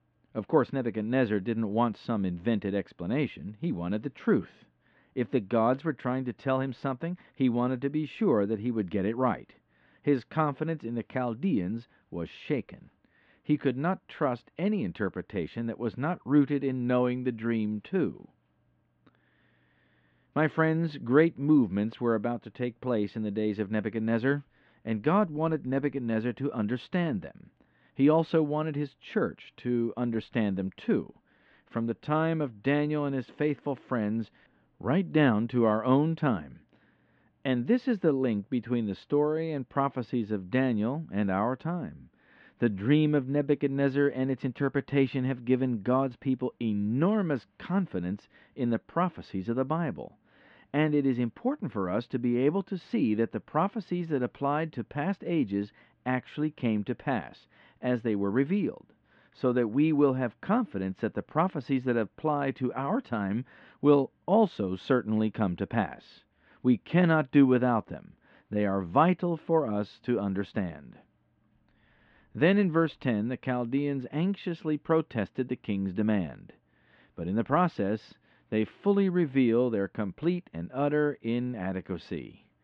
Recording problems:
muffled; very; fading above 3 kHz

